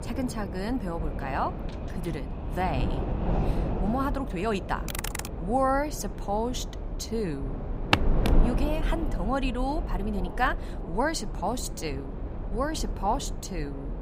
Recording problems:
wind noise on the microphone; heavy; 9 dB below the speech
keyboard typing; noticeable; at 5 s; peak 2 dB below the speech
footsteps; very faint; at 8 s; peak 5 dB above the speech

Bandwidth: 15.5 kHz